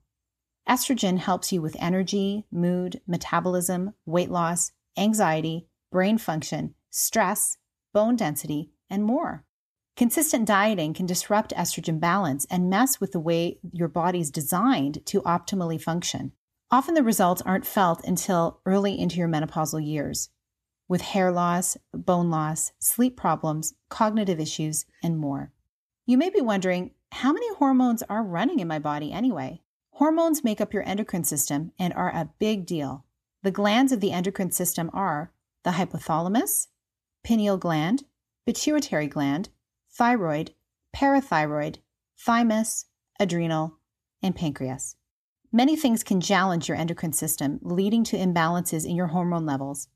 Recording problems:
none

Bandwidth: 14 kHz